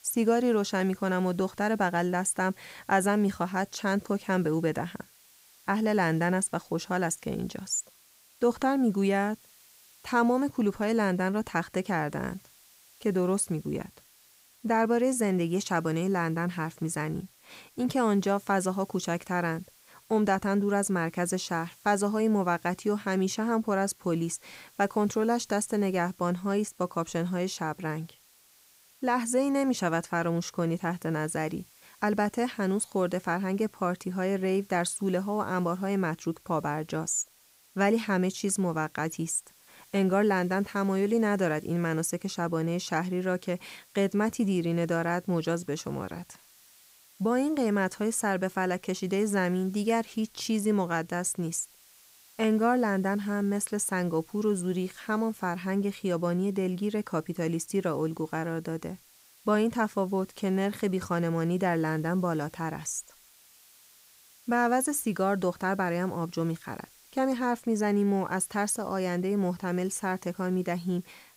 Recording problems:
hiss; faint; throughout; 25 dB below the speech

